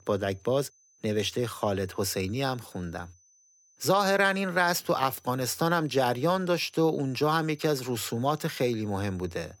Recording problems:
high-pitched whine; faint; throughout; 6 kHz, 30 dB below the speech

